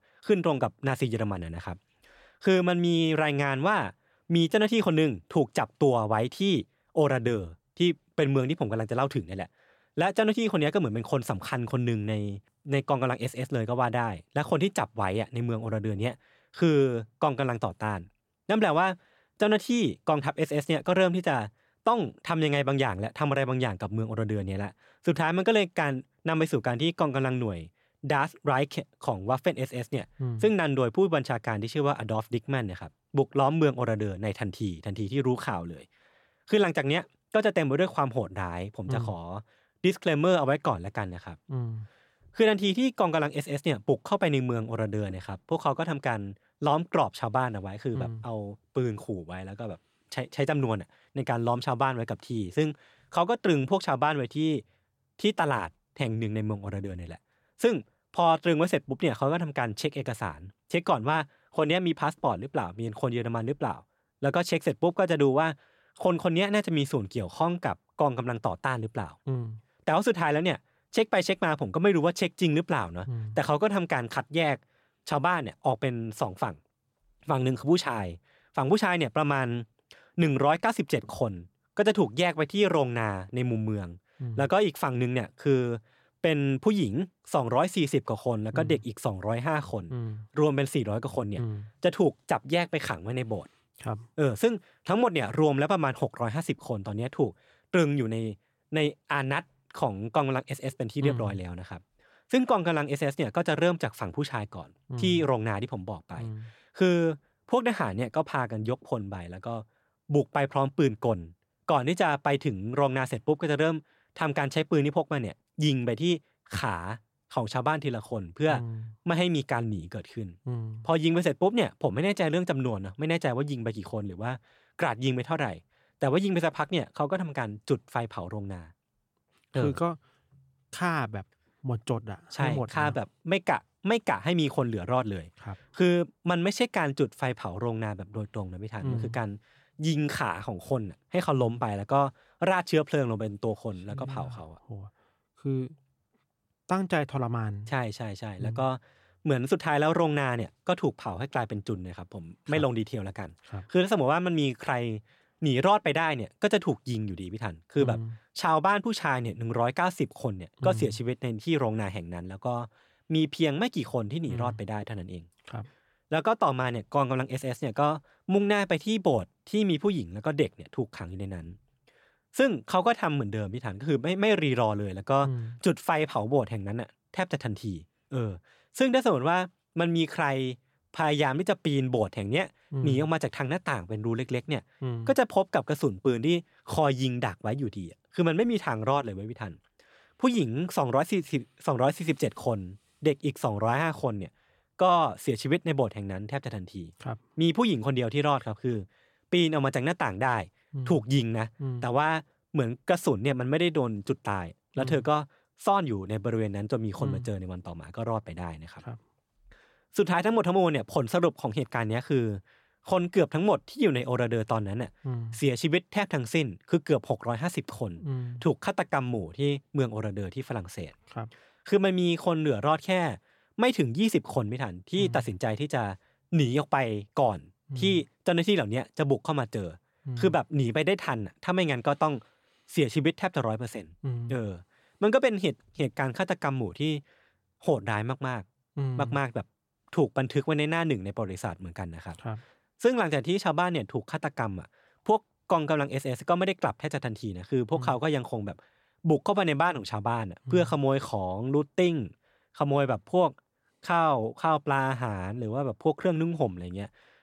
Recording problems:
none

